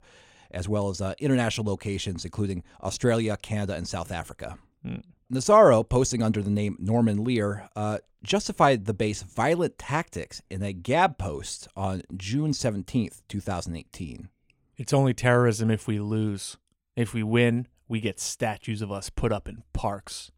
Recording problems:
none

